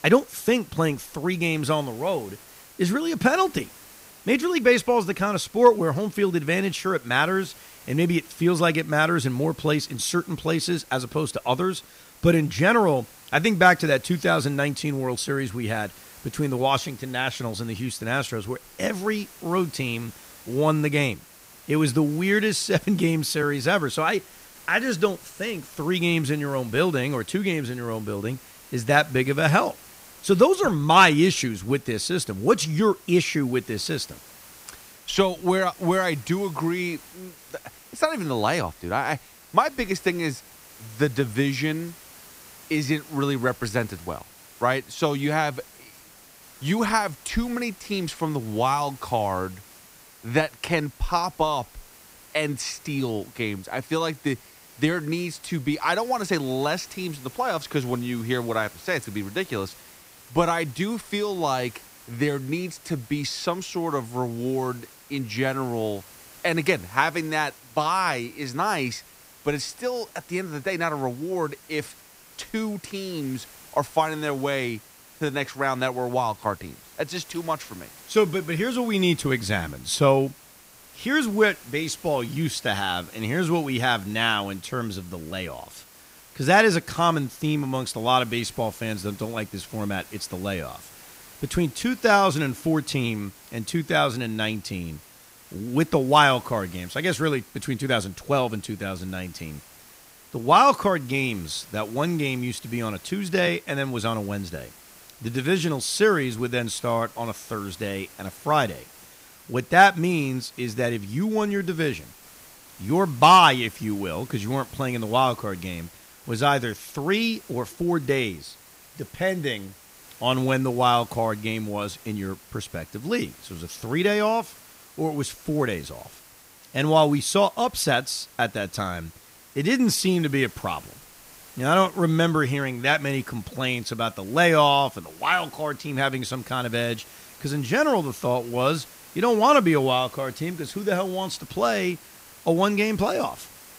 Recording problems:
hiss; faint; throughout; 20 dB below the speech

